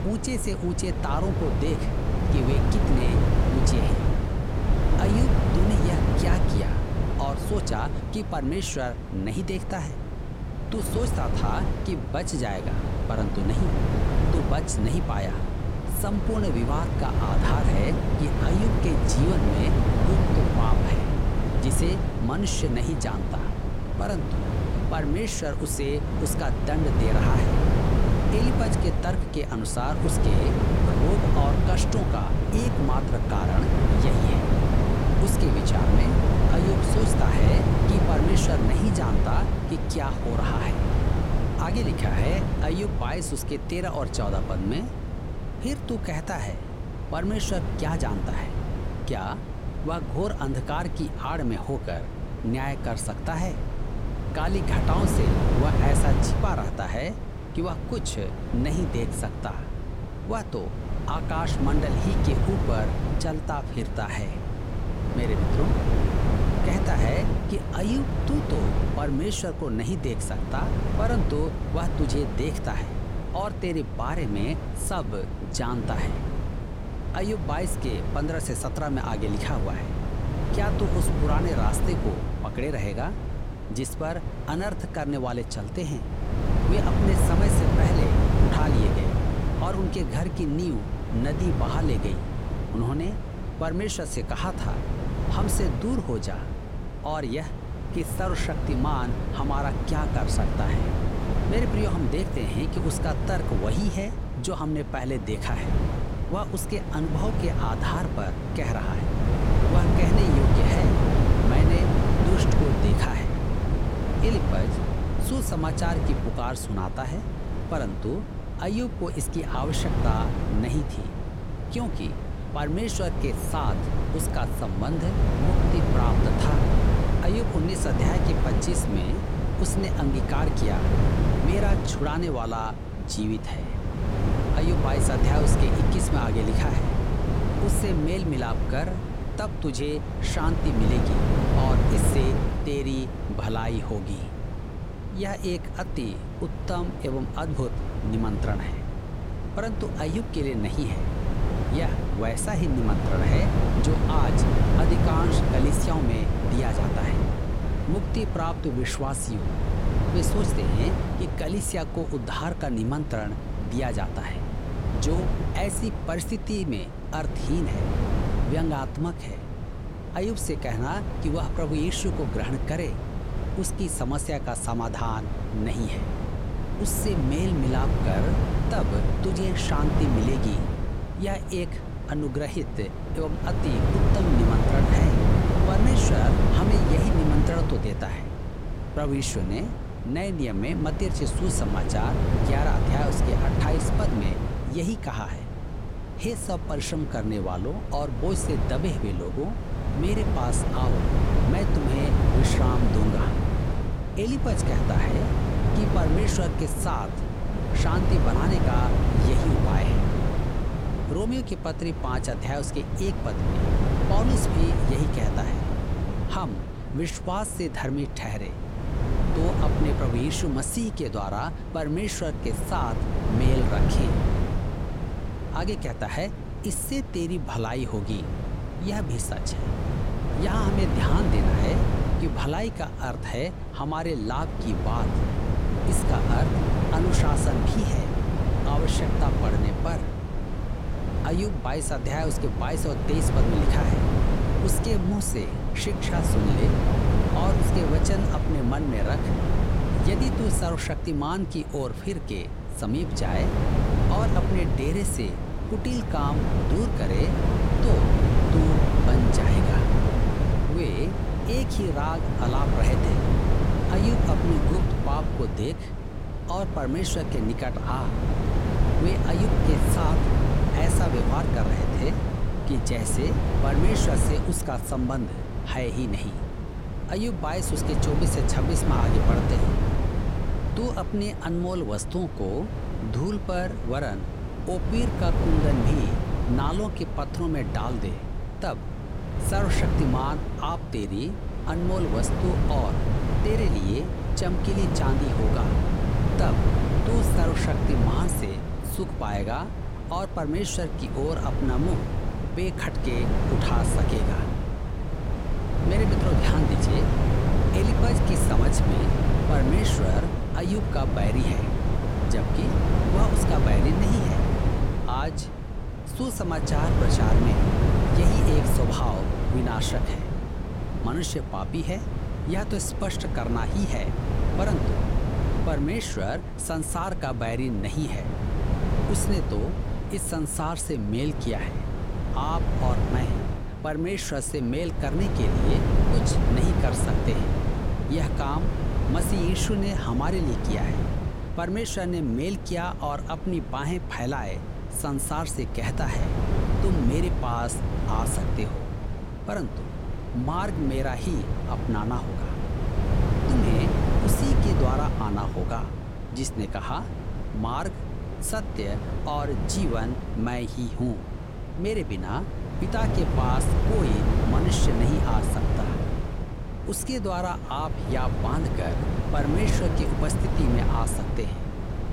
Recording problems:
wind noise on the microphone; heavy; 1 dB below the speech

